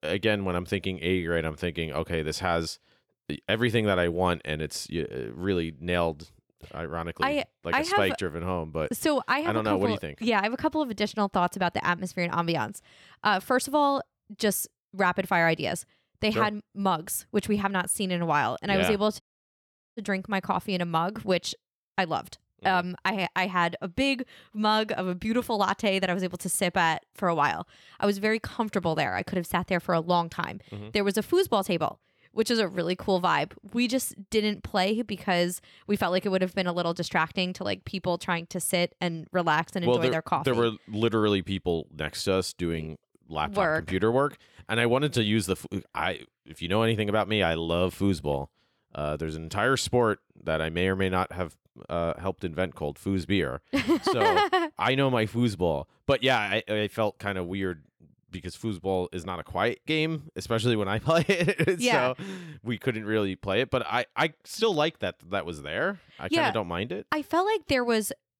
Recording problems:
audio cutting out; at 19 s for 1 s

